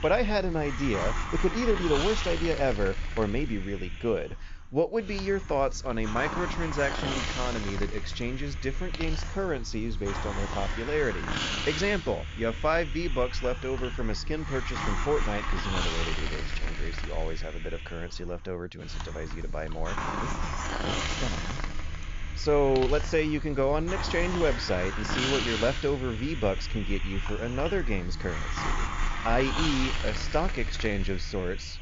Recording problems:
high frequencies cut off; noticeable; nothing above 7 kHz
hiss; loud; throughout; 4 dB below the speech

